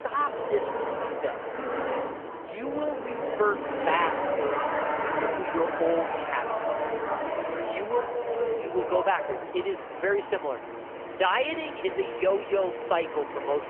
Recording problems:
phone-call audio; poor line; nothing above 3 kHz
traffic noise; loud; throughout; 2 dB below the speech

